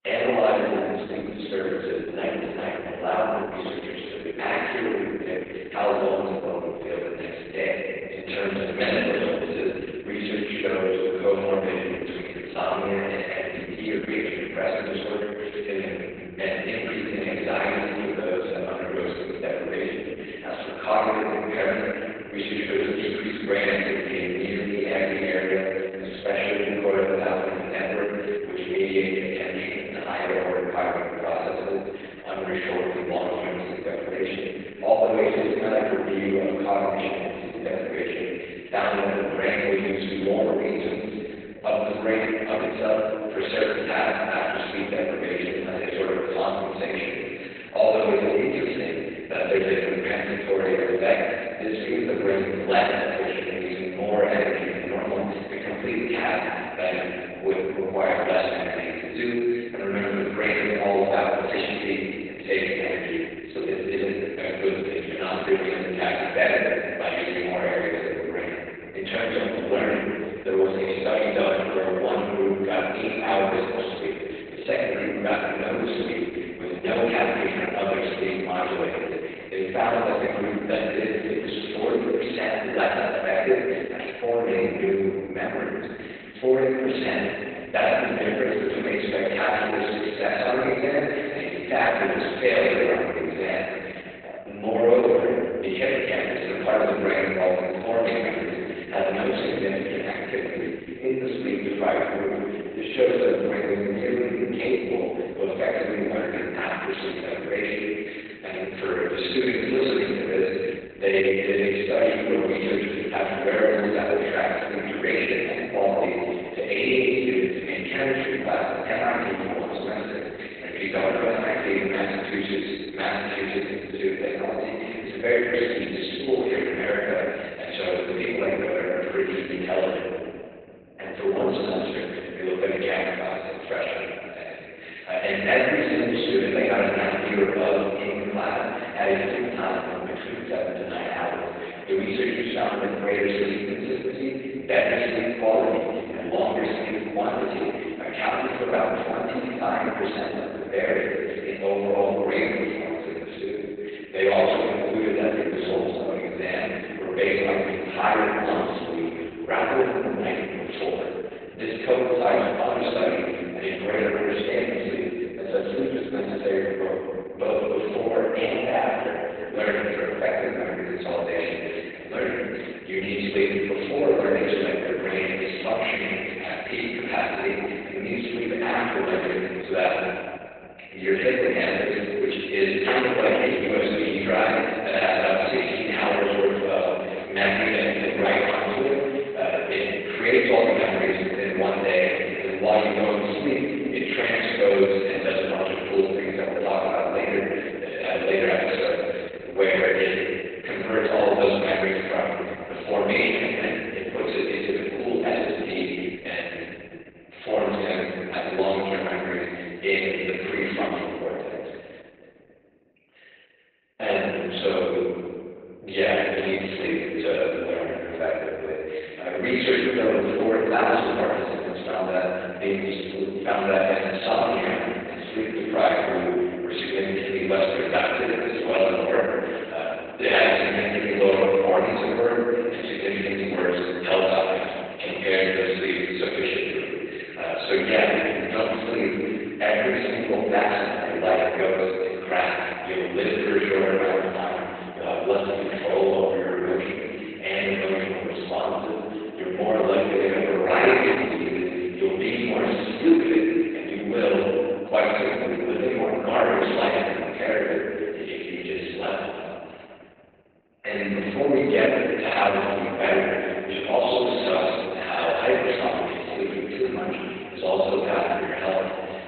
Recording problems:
room echo; strong; dies away in 2.2 s
off-mic speech; far
garbled, watery; badly; nothing above 4 kHz
thin; somewhat; fading below 450 Hz

